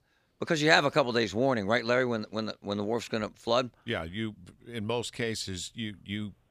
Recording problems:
none

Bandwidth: 15 kHz